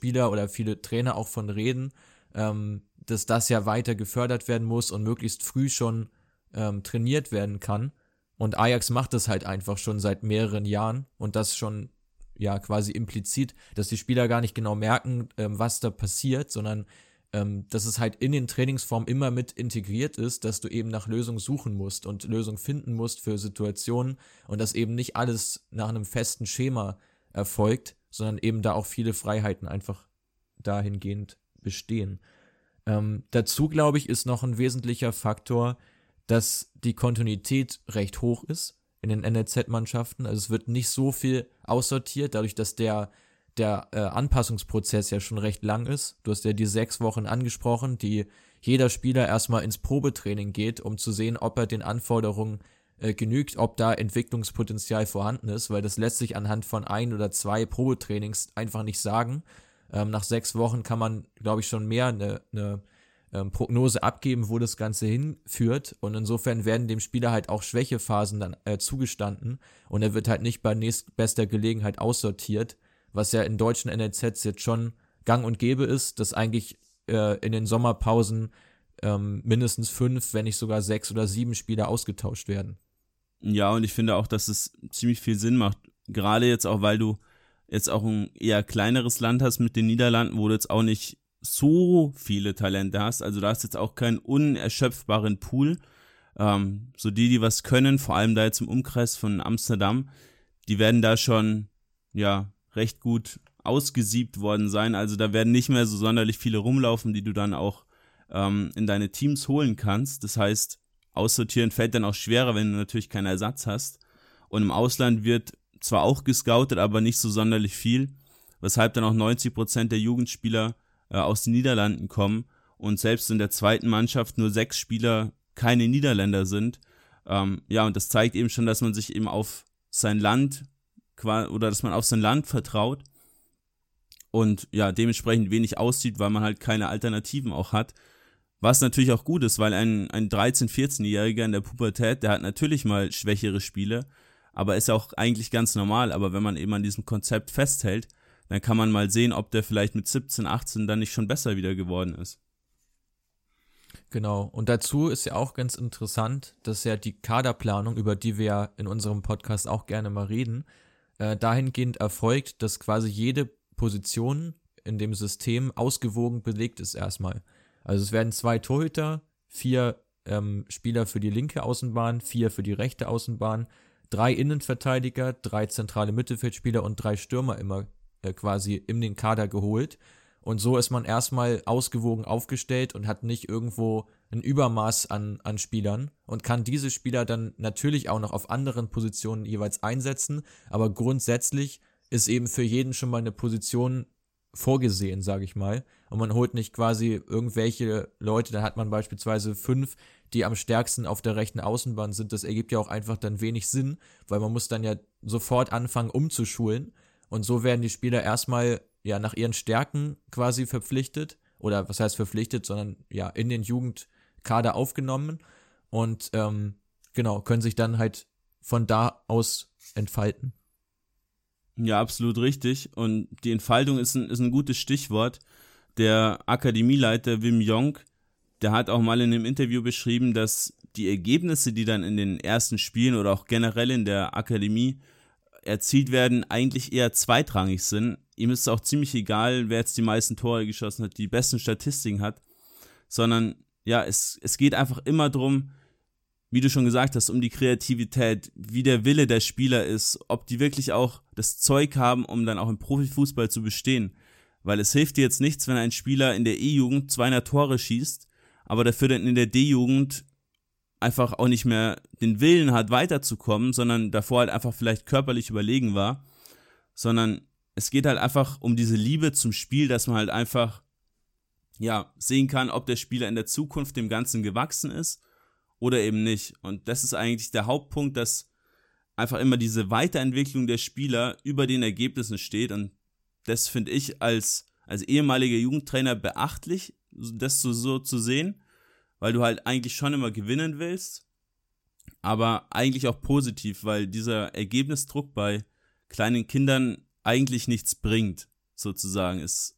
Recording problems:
none

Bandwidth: 16.5 kHz